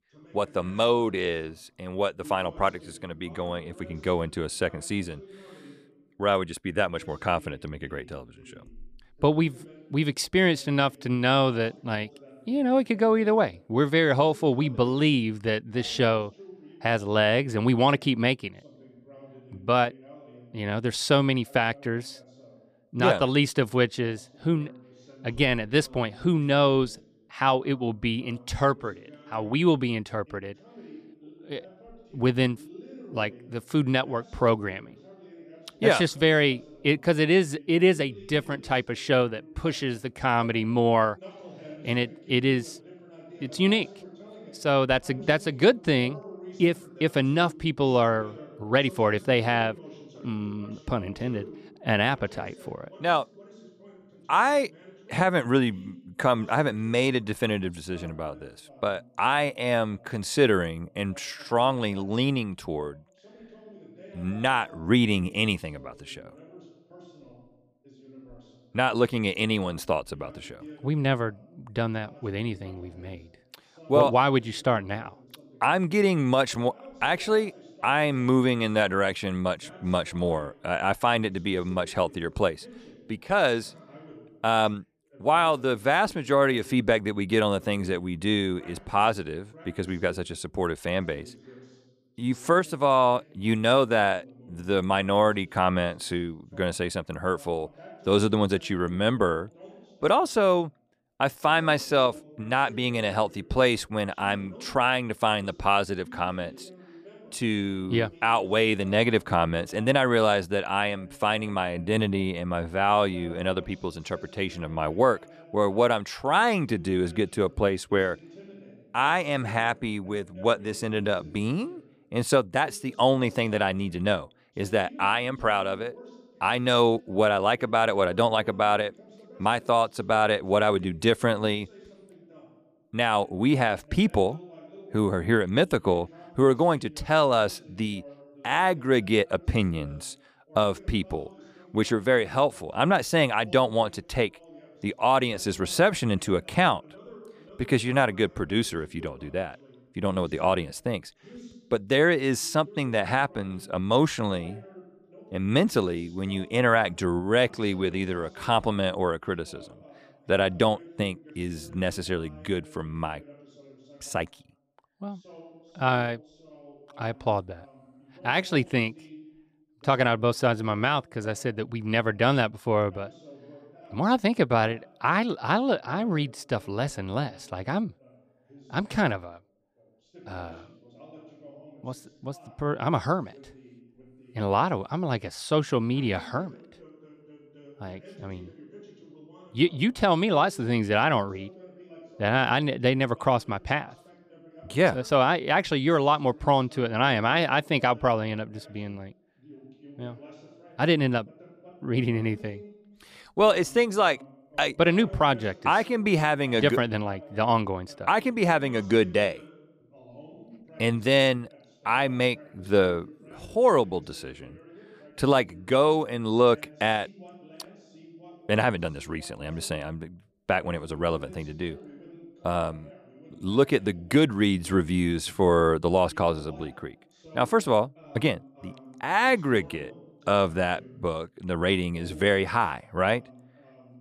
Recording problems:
voice in the background; faint; throughout; 25 dB below the speech

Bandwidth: 15 kHz